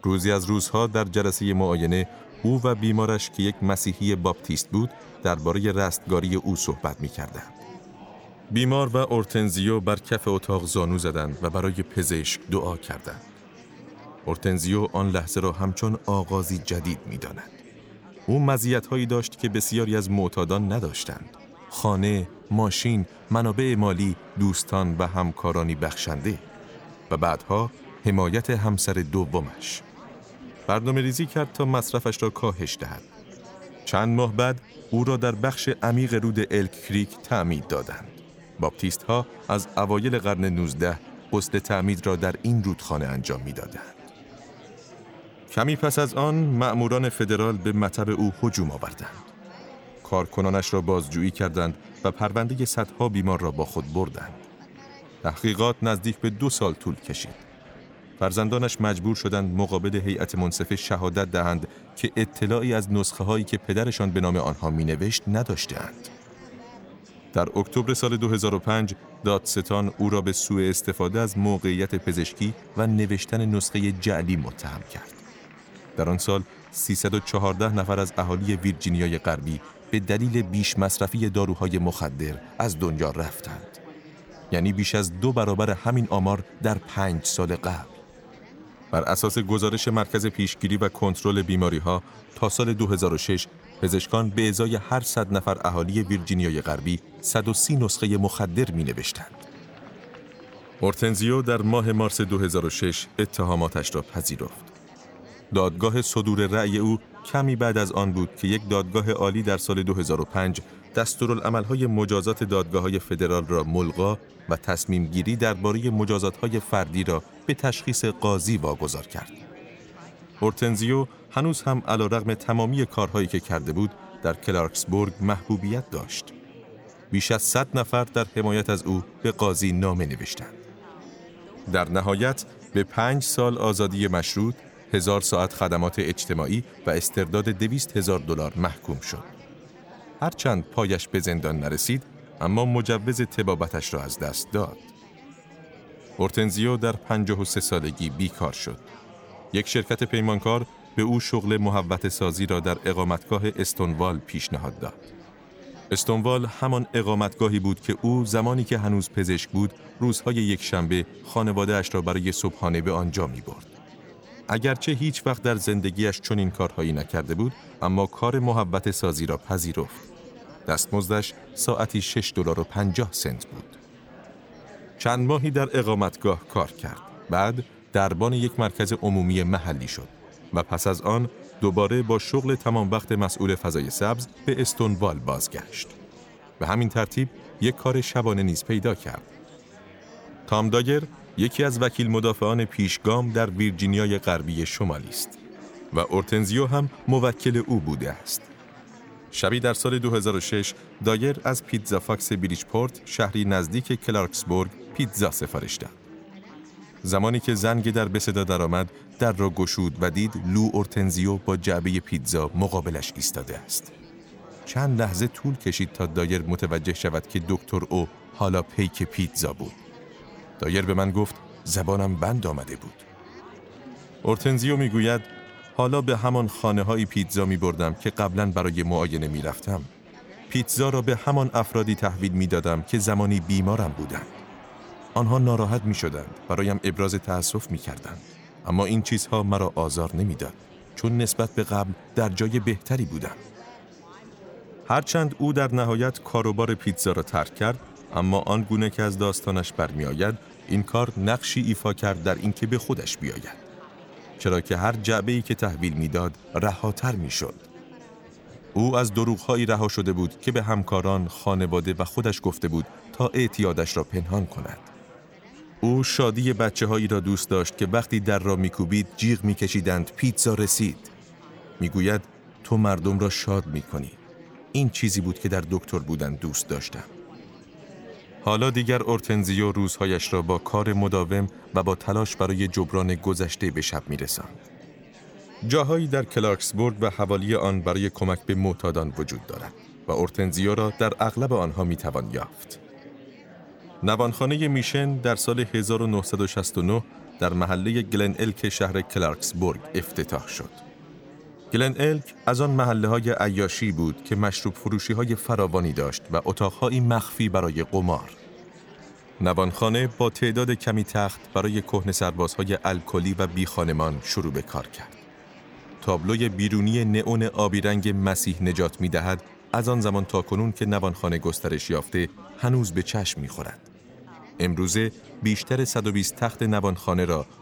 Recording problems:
chatter from many people; faint; throughout; 20 dB below the speech

